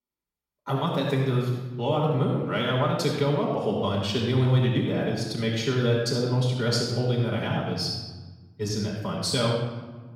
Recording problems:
off-mic speech; far
room echo; noticeable; dies away in 1.1 s

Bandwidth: 16.5 kHz